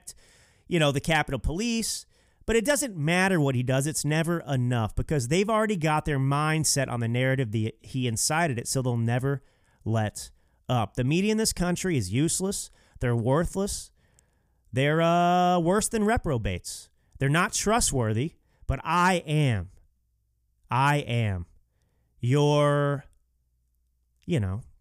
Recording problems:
none

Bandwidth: 15 kHz